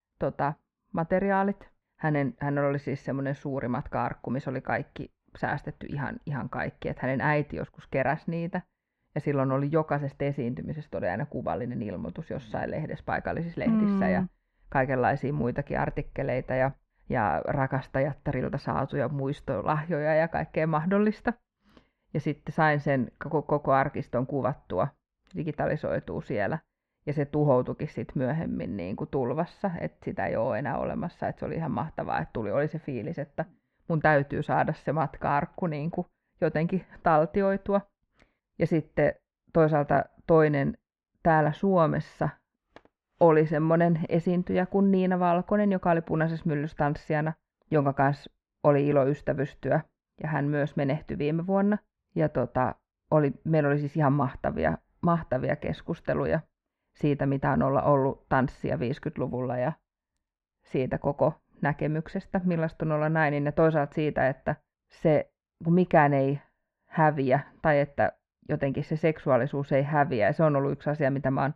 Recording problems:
muffled; very; fading above 1.5 kHz

